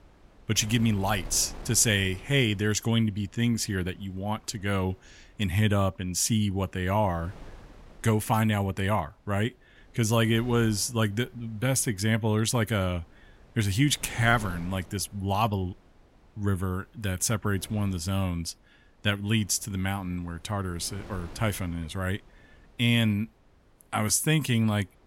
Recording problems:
wind noise on the microphone; occasional gusts; 25 dB below the speech

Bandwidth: 16 kHz